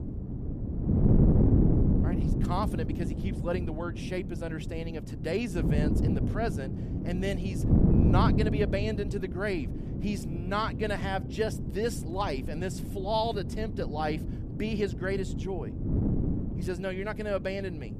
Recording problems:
wind noise on the microphone; heavy; 5 dB below the speech

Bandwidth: 14.5 kHz